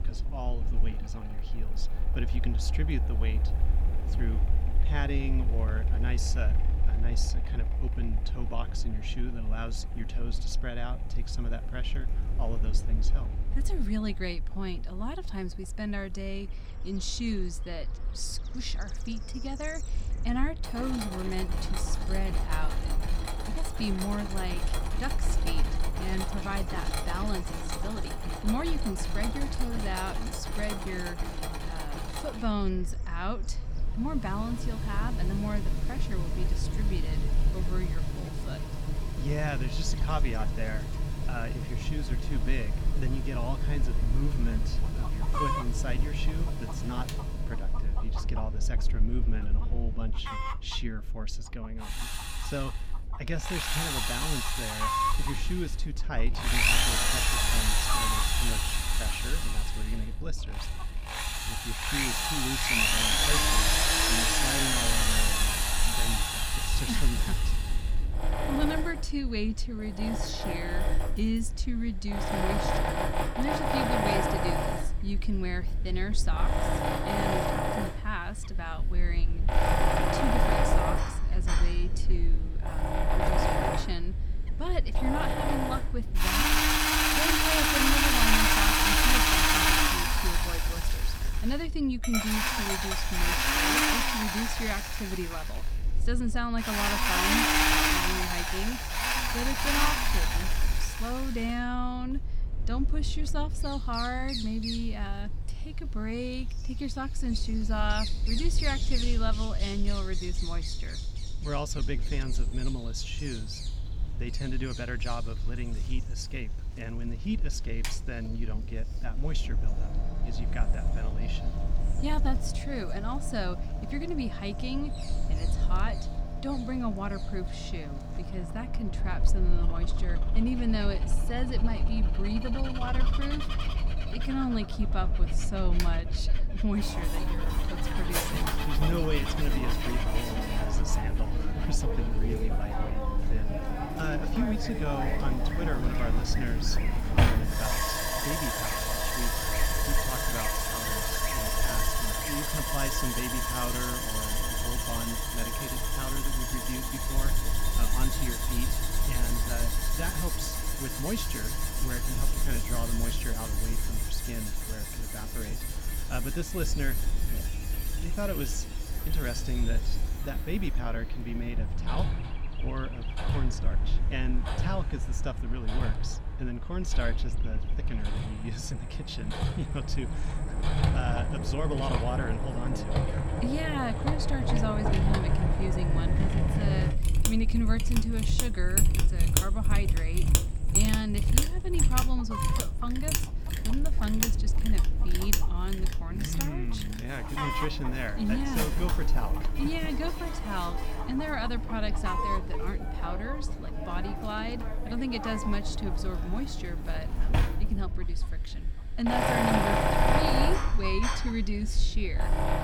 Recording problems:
machinery noise; very loud; throughout; 5 dB above the speech
animal sounds; loud; throughout; 7 dB below the speech
low rumble; noticeable; throughout; 15 dB below the speech

